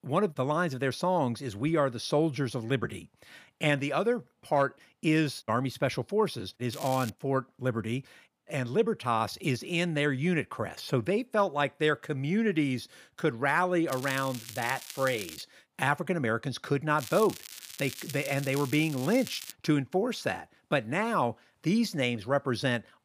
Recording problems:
crackling; noticeable; at 6.5 s, from 14 to 15 s and from 17 to 20 s; 10 dB below the speech

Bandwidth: 15 kHz